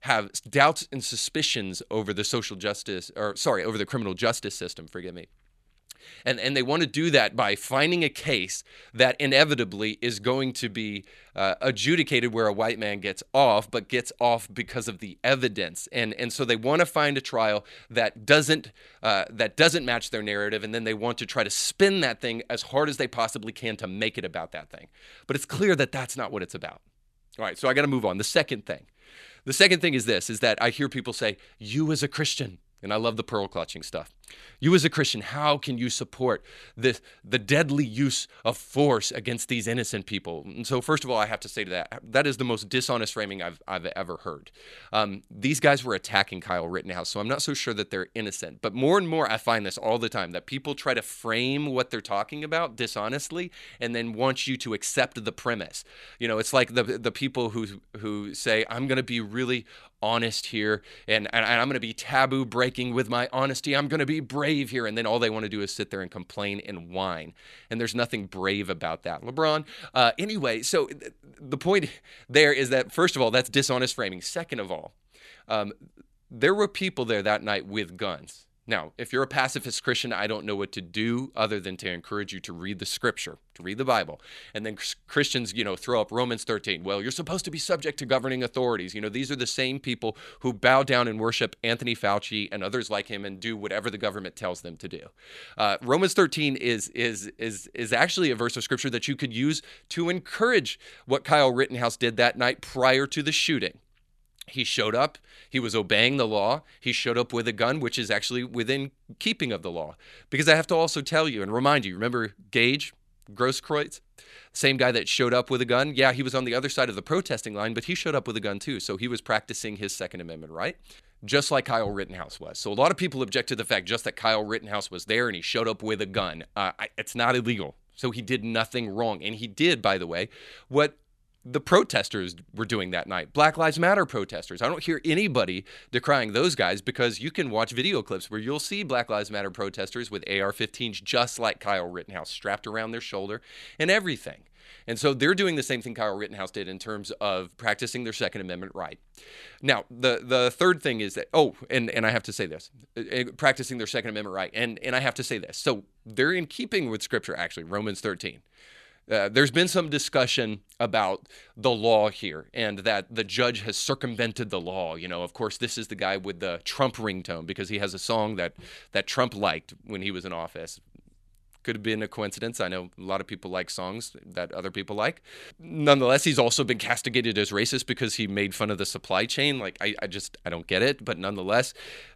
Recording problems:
none

